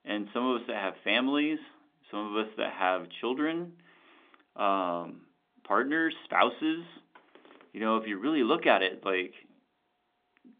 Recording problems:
phone-call audio; nothing above 3.5 kHz

